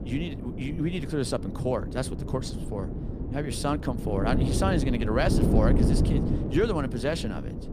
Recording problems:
wind noise on the microphone; heavy; 5 dB below the speech

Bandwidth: 15 kHz